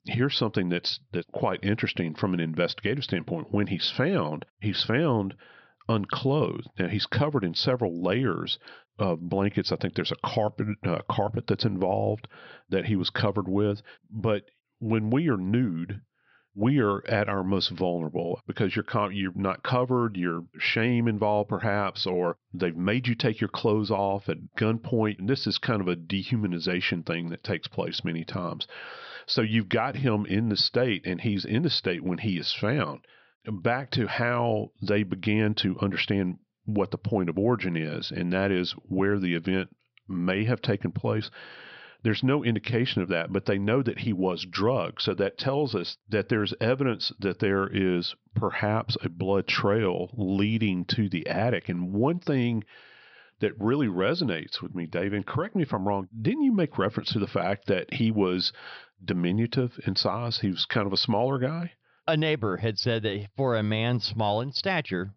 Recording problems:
high frequencies cut off; noticeable; nothing above 5.5 kHz

